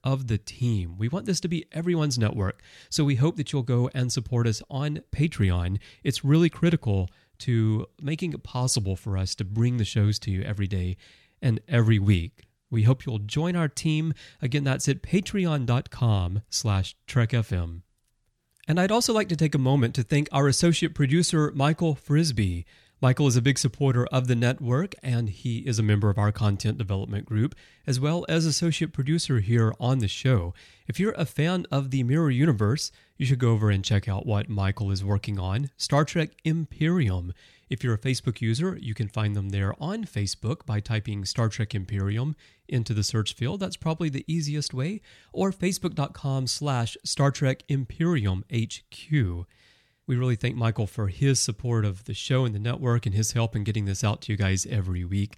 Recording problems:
none

